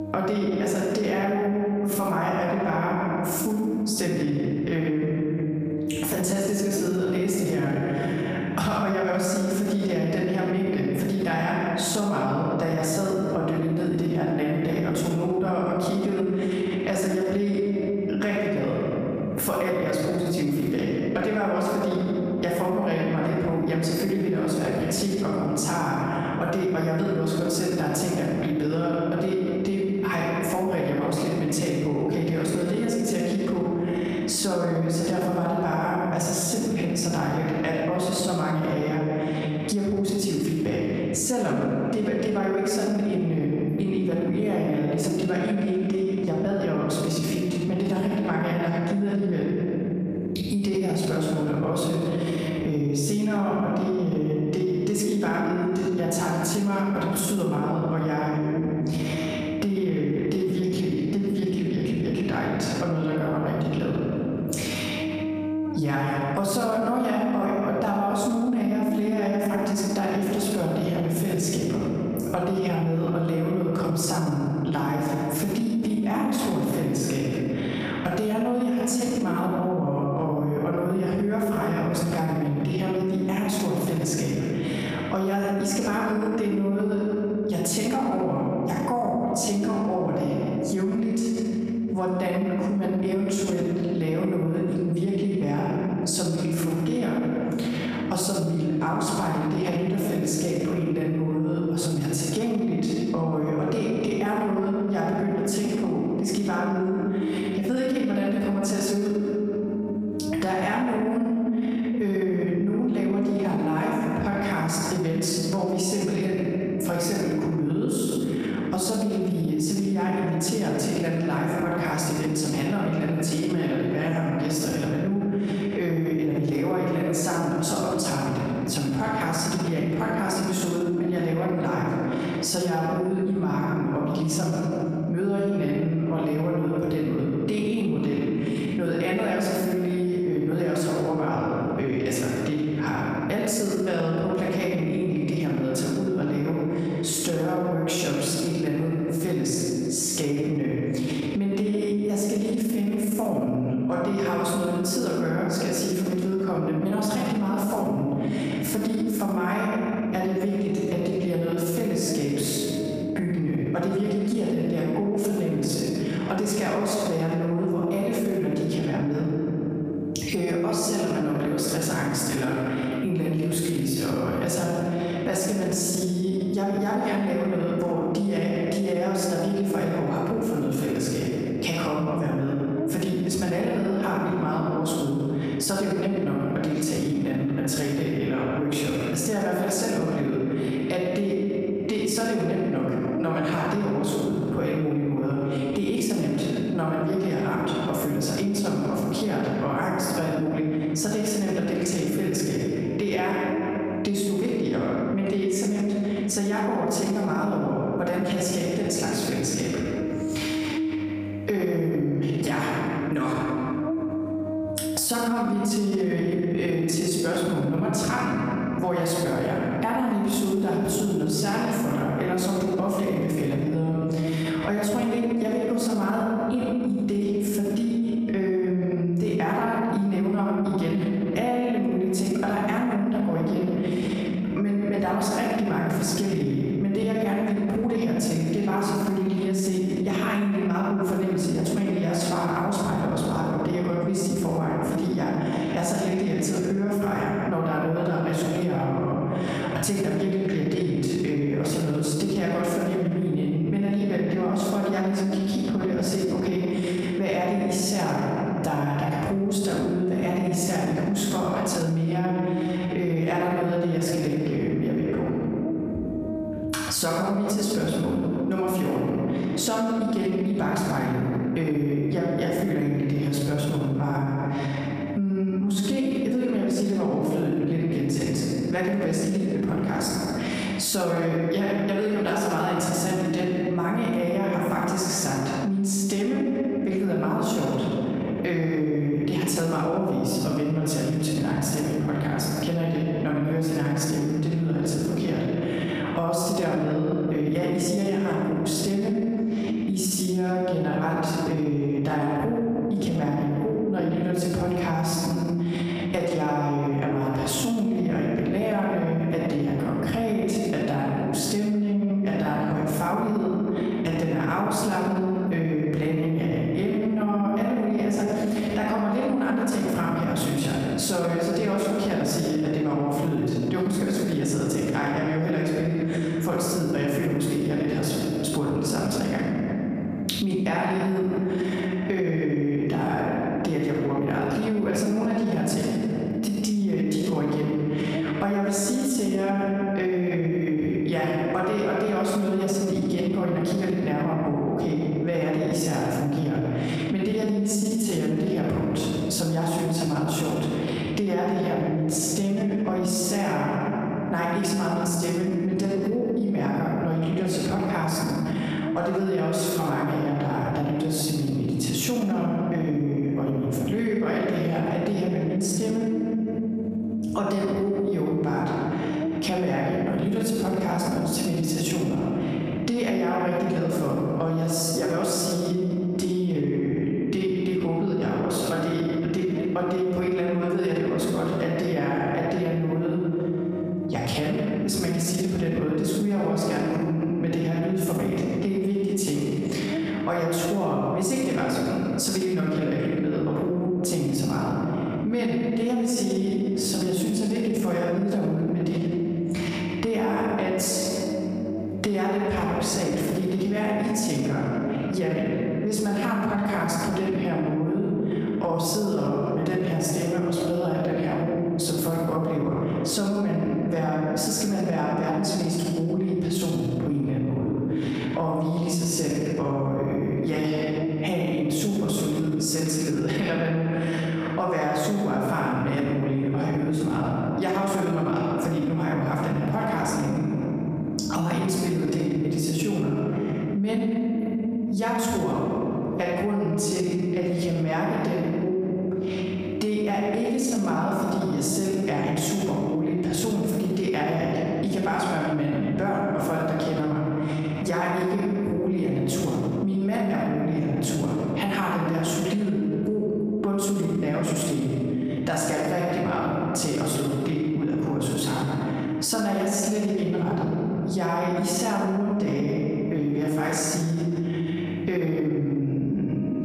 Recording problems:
off-mic speech; far
room echo; noticeable; dies away in 1.8 s
squashed, flat; somewhat
electrical hum; noticeable; throughout; 50 Hz, 15 dB below the speech

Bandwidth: 15 kHz